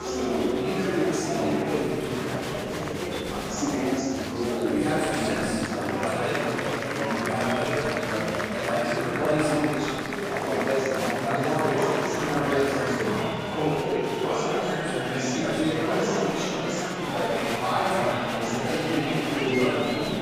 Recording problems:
room echo; strong; dies away in 2.4 s
off-mic speech; far
chatter from many people; very loud; throughout; 3 dB above the speech
background music; faint; throughout; 20 dB below the speech

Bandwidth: 15.5 kHz